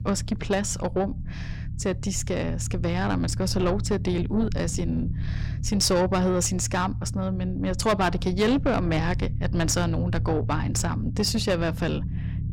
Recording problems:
distortion; slight; 10 dB below the speech
low rumble; noticeable; throughout; 15 dB below the speech

